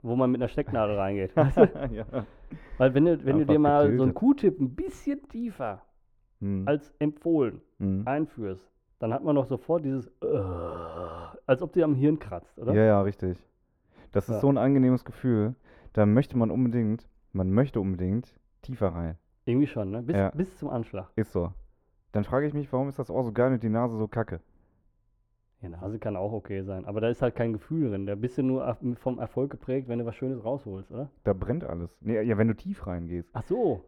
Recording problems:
muffled; very; fading above 2.5 kHz

